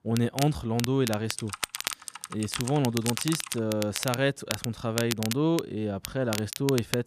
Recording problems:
crackle, like an old record; loud; 6 dB below the speech
keyboard typing; noticeable; from 1.5 to 3.5 s; peak 6 dB below the speech

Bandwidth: 14.5 kHz